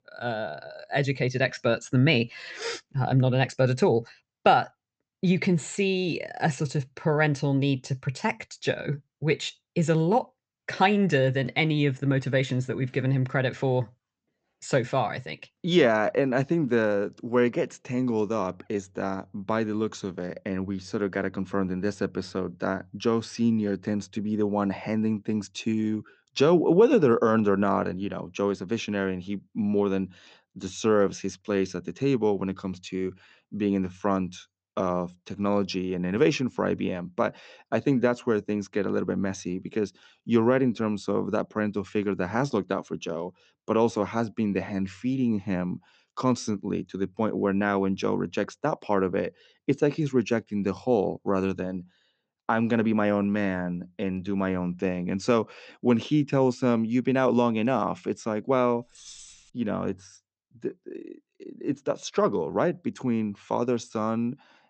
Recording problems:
high frequencies cut off; noticeable; nothing above 8 kHz
jangling keys; faint; at 59 s; peak 15 dB below the speech

